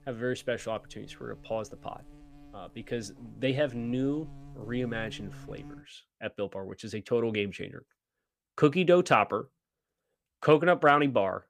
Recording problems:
electrical hum; faint; until 6 s; 60 Hz, 30 dB below the speech

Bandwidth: 15 kHz